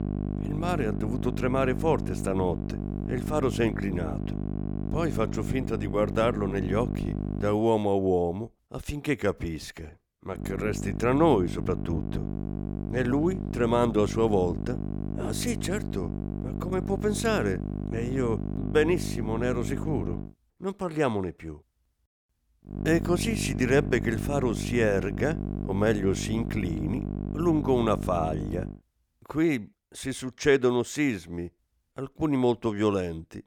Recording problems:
electrical hum; noticeable; until 7.5 s, from 10 to 20 s and from 23 to 29 s; 50 Hz, 10 dB below the speech

